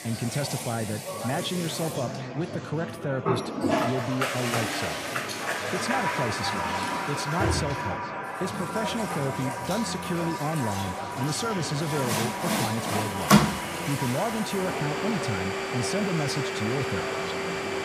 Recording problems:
echo of what is said; noticeable; throughout; 500 ms later, 15 dB below the speech
household noises; very loud; throughout; 2 dB above the speech
murmuring crowd; loud; throughout; 6 dB below the speech

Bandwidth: 15 kHz